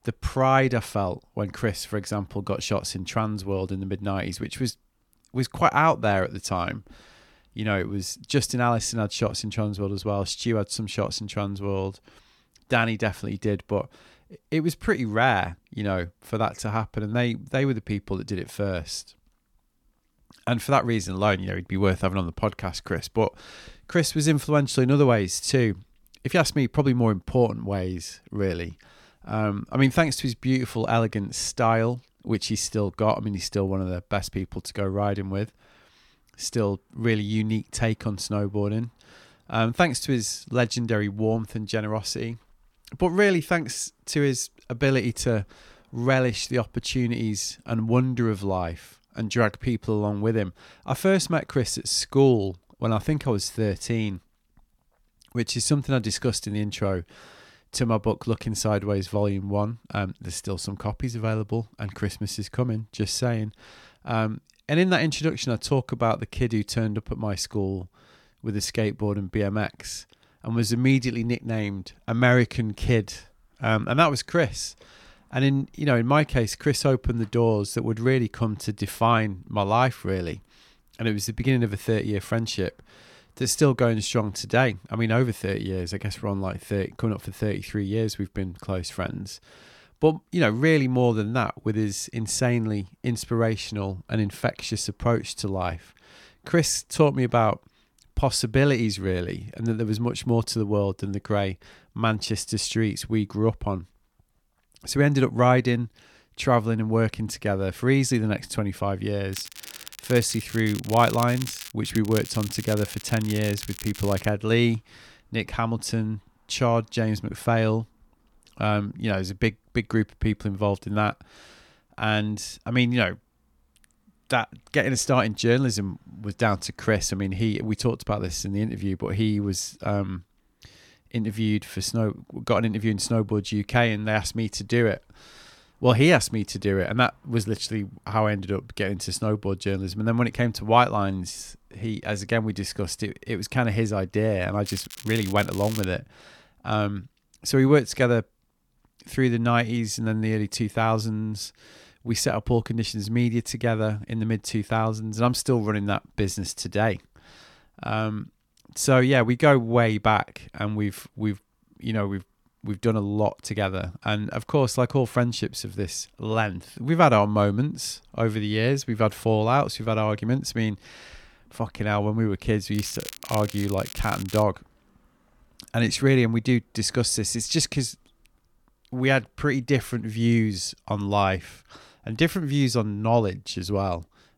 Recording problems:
crackling; noticeable; 4 times, first at 1:49; 15 dB below the speech

